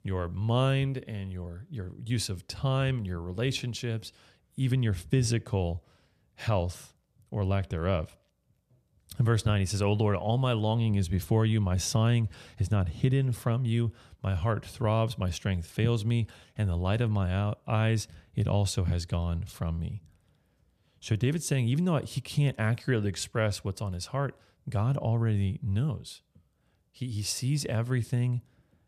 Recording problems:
none

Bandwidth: 14.5 kHz